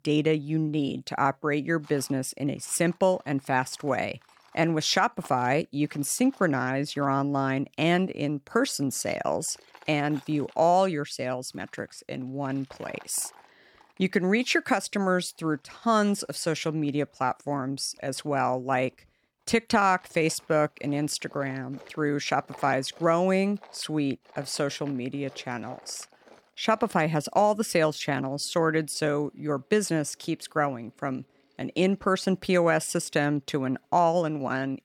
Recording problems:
machinery noise; faint; throughout; 30 dB below the speech

